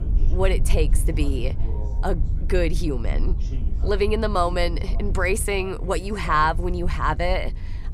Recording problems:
wind noise on the microphone; occasional gusts; 20 dB below the speech
background chatter; faint; throughout; 2 voices, 20 dB below the speech

